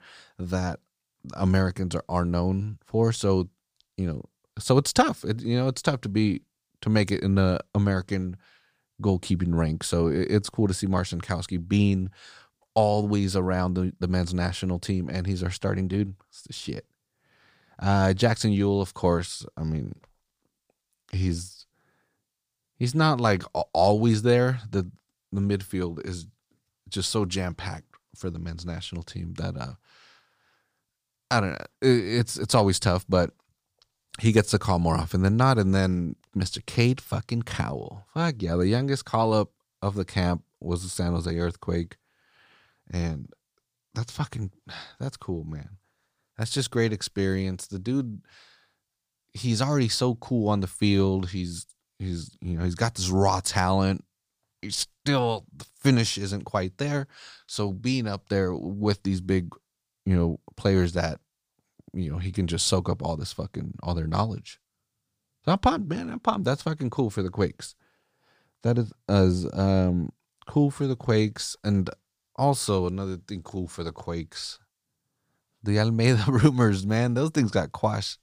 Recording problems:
none

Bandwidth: 15 kHz